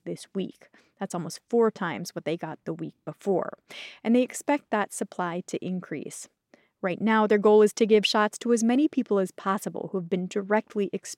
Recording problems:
none

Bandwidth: 16 kHz